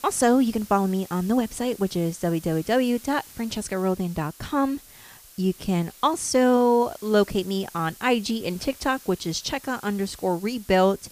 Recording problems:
hiss; faint; throughout; 20 dB below the speech

